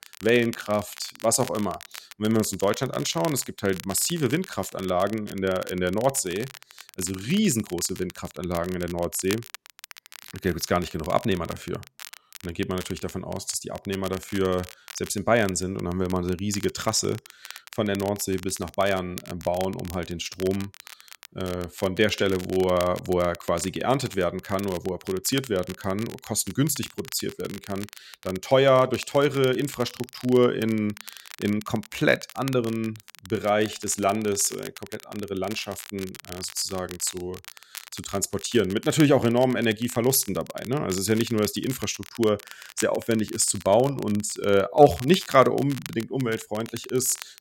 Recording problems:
crackle, like an old record; noticeable; 15 dB below the speech

